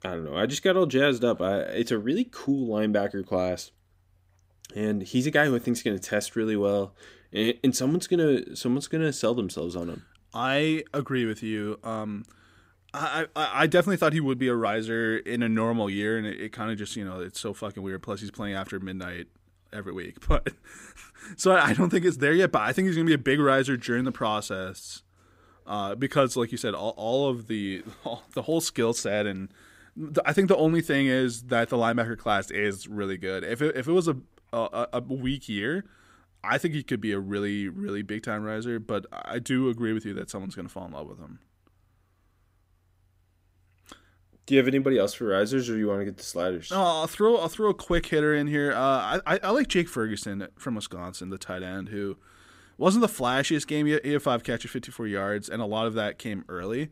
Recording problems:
none

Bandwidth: 15.5 kHz